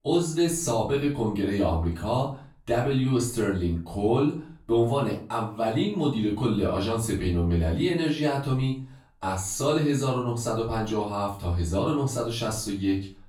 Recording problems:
off-mic speech; far
room echo; slight; dies away in 0.3 s

